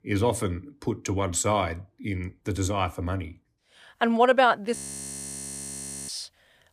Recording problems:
audio freezing; at 5 s for 1.5 s

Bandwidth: 15 kHz